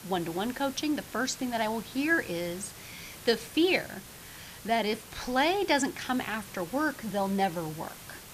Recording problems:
hiss; noticeable; throughout; 15 dB below the speech

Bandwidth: 14.5 kHz